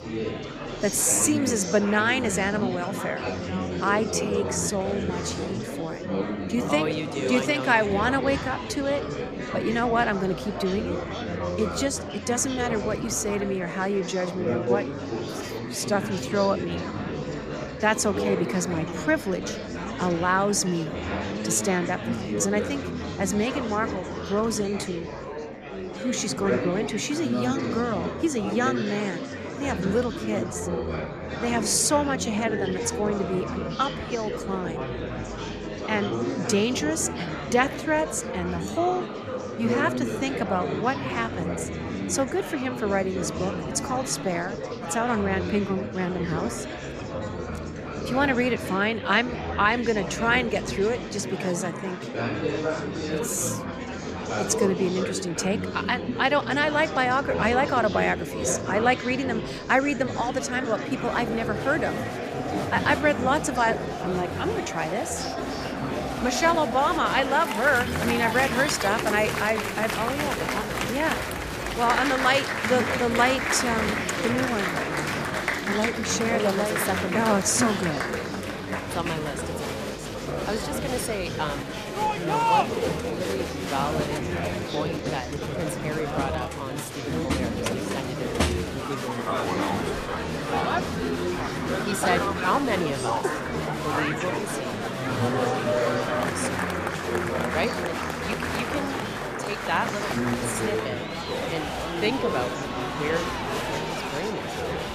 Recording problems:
murmuring crowd; loud; throughout; 3 dB below the speech

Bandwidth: 14.5 kHz